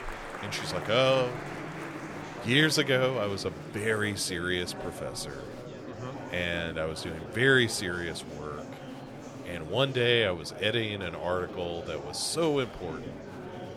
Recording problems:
murmuring crowd; noticeable; throughout; 10 dB below the speech

